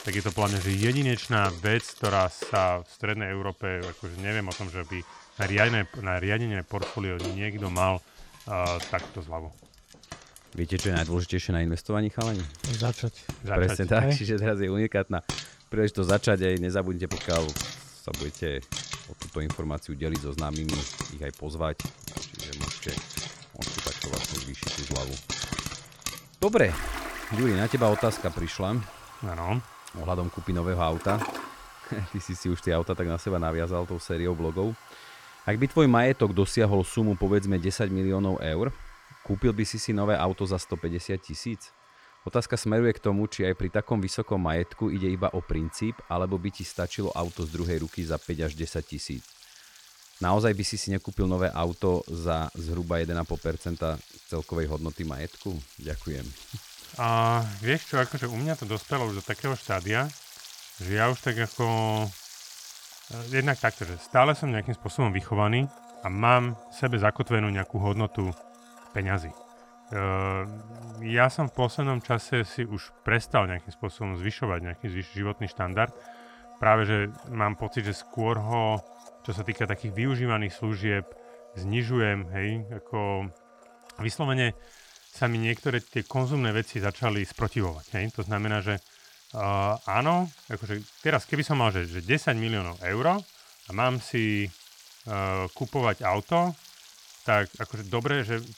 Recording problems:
household noises; noticeable; throughout; 15 dB below the speech

